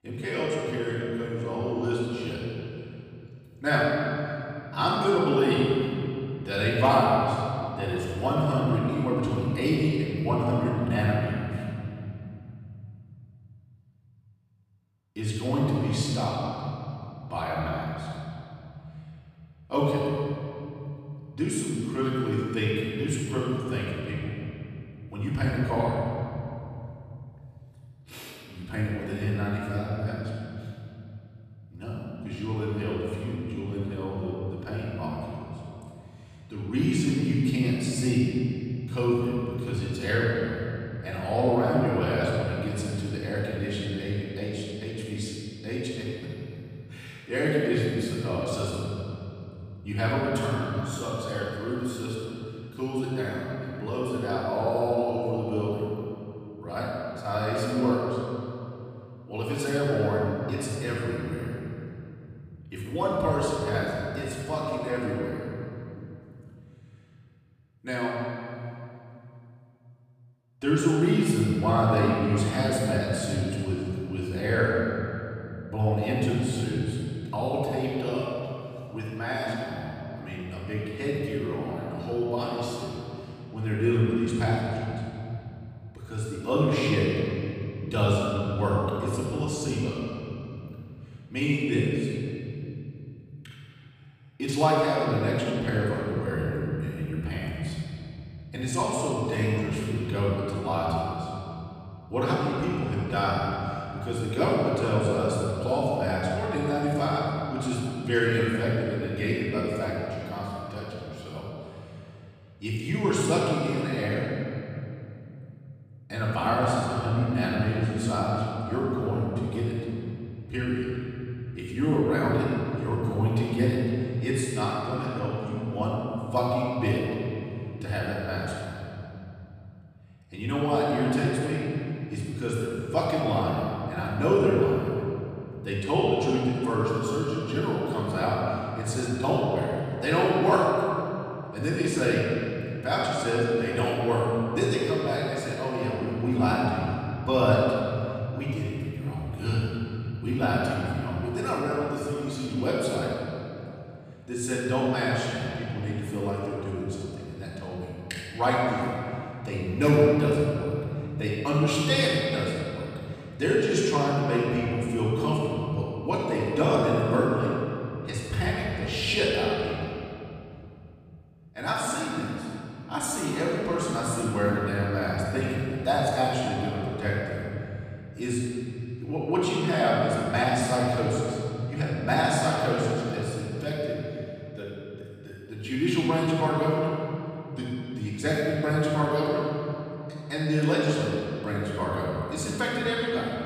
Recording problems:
room echo; strong; dies away in 3 s
off-mic speech; far

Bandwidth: 15 kHz